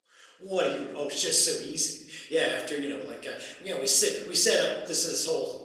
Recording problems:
room echo; noticeable; dies away in 0.9 s
thin; somewhat; fading below 300 Hz
off-mic speech; somewhat distant
garbled, watery; slightly; nothing above 15.5 kHz

